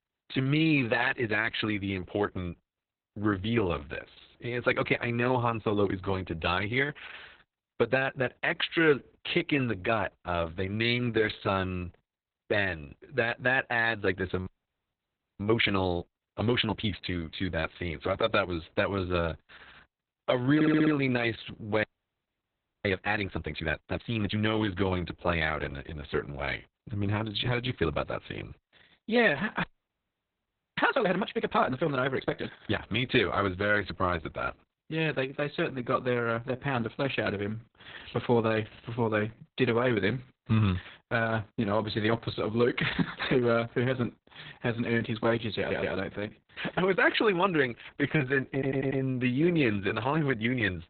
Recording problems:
garbled, watery; badly; nothing above 4 kHz
audio freezing; at 14 s for 1 s, at 22 s for 1 s and at 30 s for 1 s
audio stuttering; at 21 s, at 46 s and at 49 s

